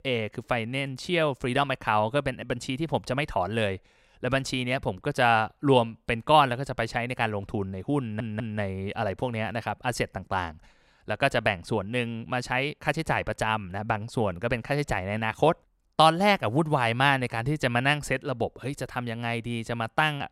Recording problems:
audio stuttering; at 8 s

